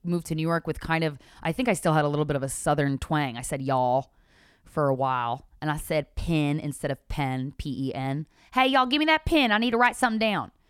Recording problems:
none

